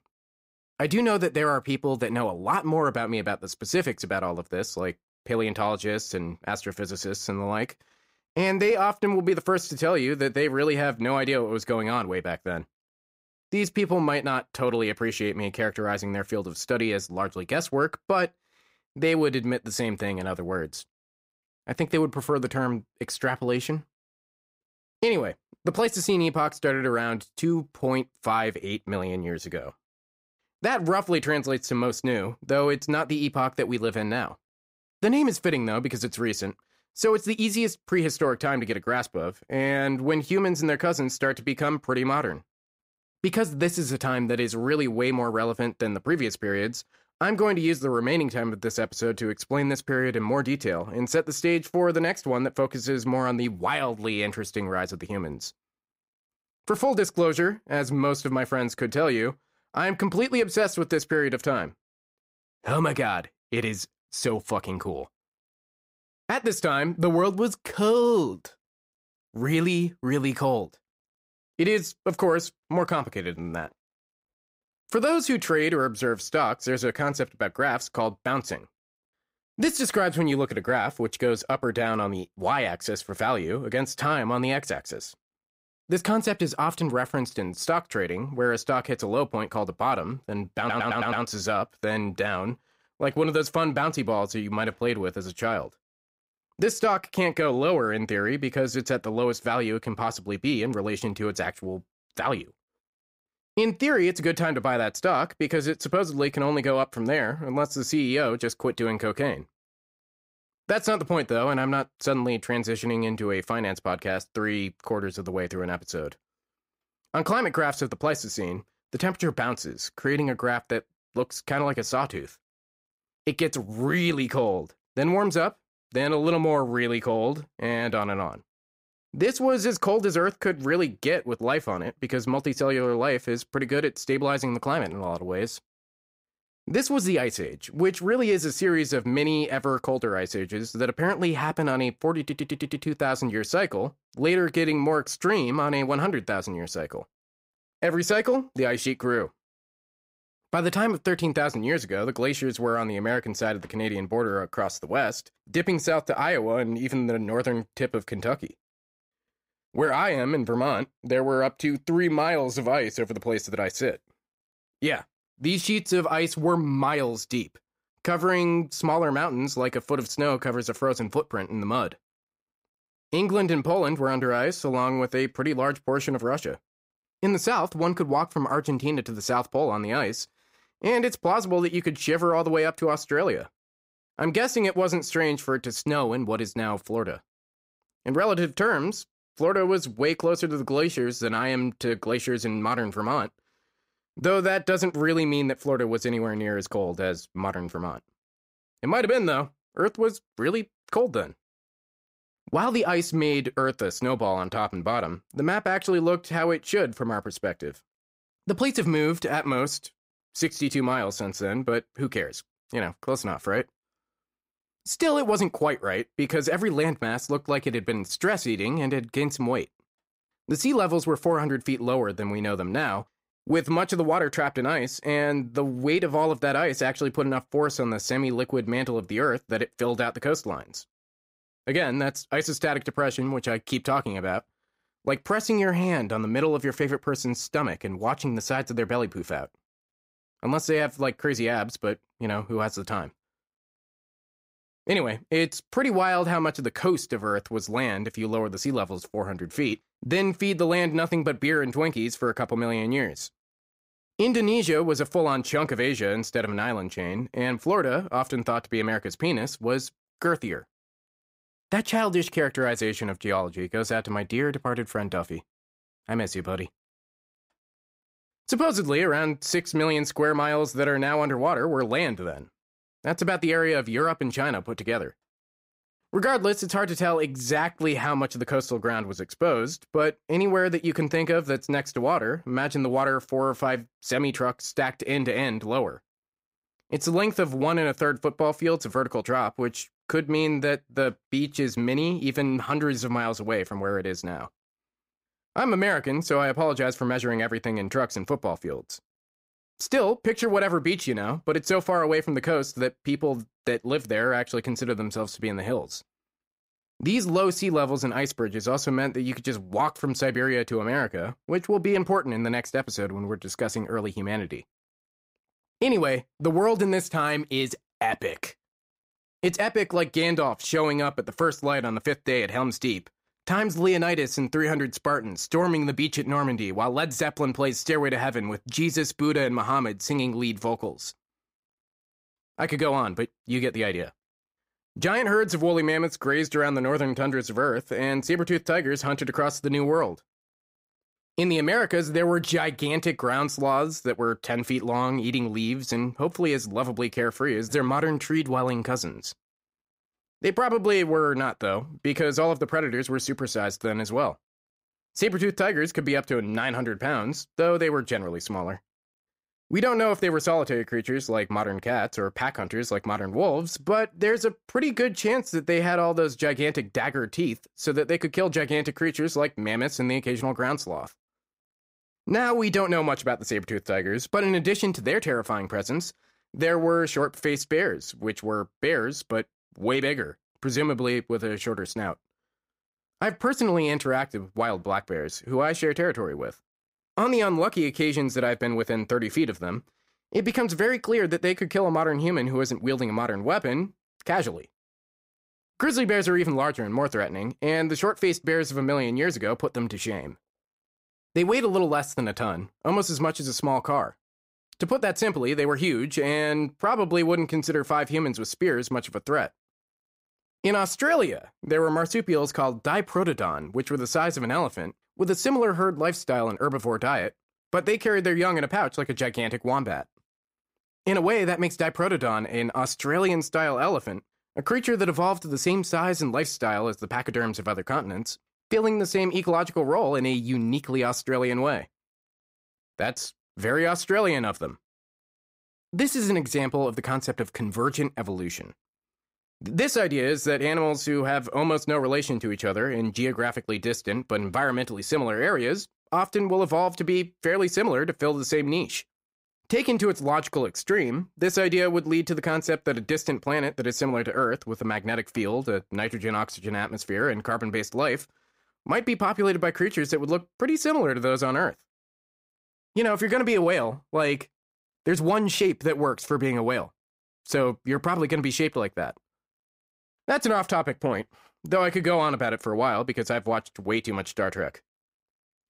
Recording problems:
audio stuttering; at 1:31 and at 2:22

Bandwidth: 15.5 kHz